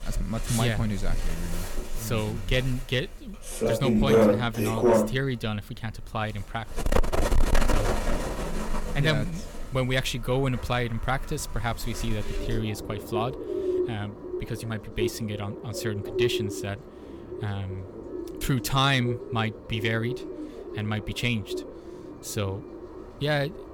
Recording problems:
distortion; heavy; 6 dB below the speech
animal sounds; loud; throughout; 1 dB below the speech

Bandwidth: 17.5 kHz